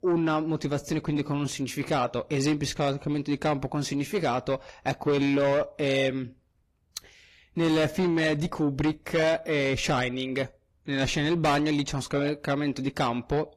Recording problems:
distortion; slight; 10 dB below the speech
garbled, watery; slightly; nothing above 17.5 kHz

